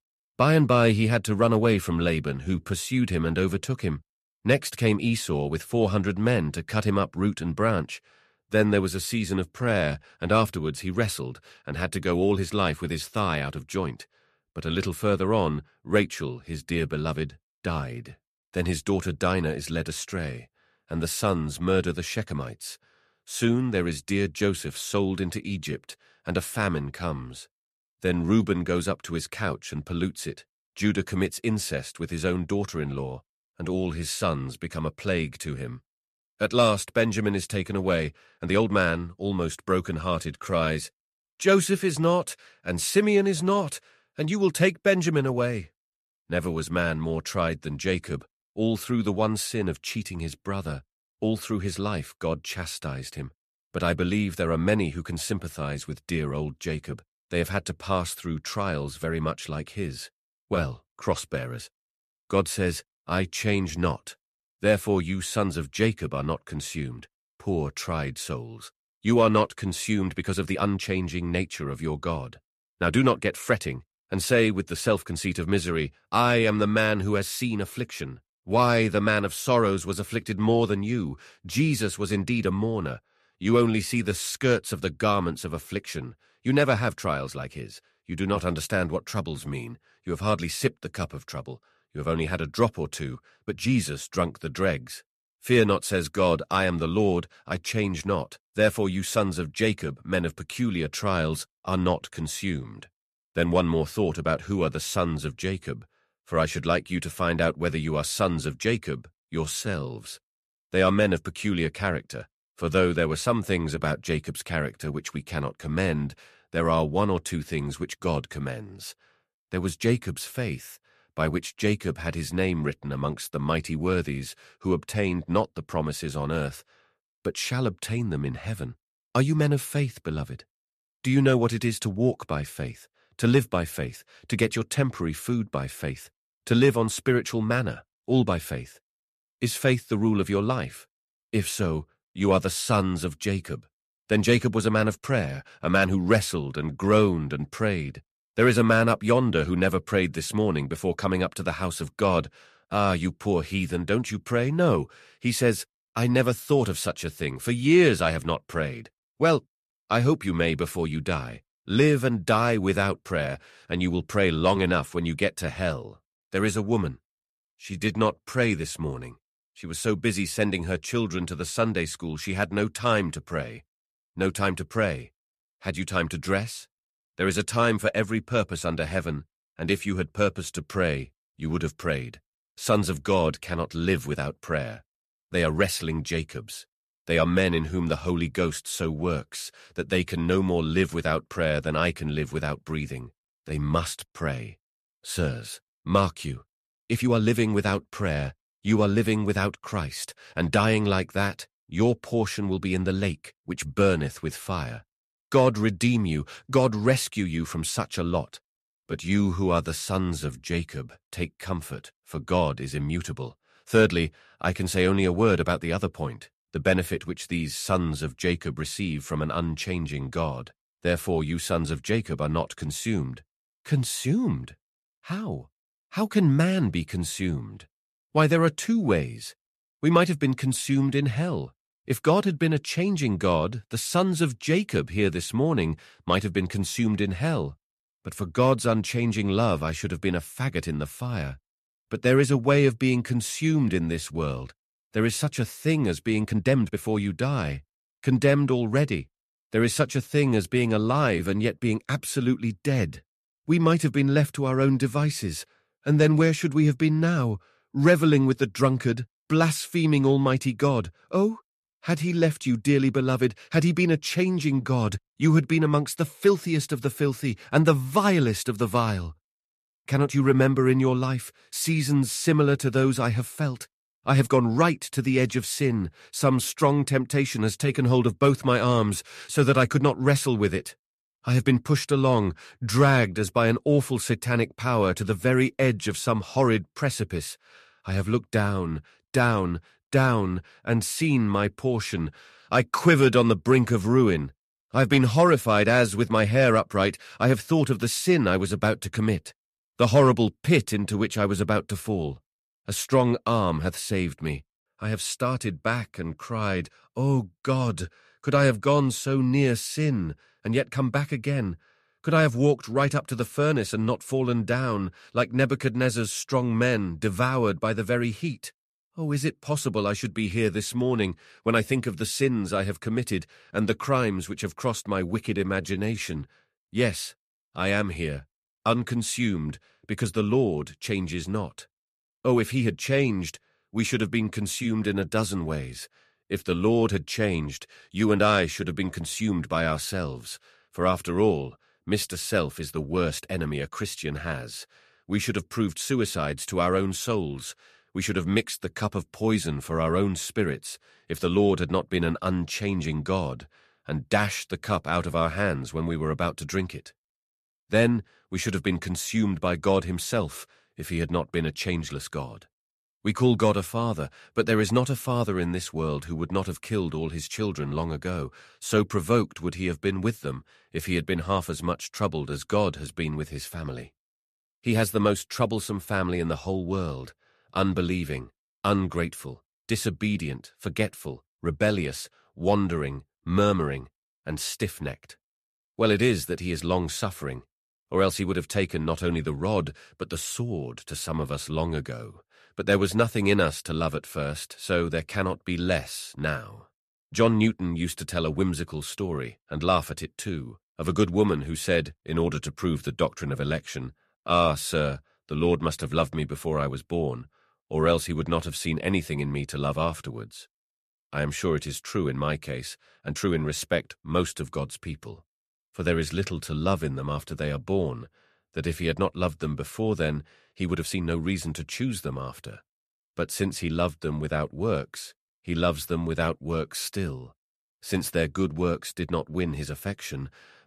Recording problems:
uneven, jittery; strongly; from 2.5 s to 7:01

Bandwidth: 14 kHz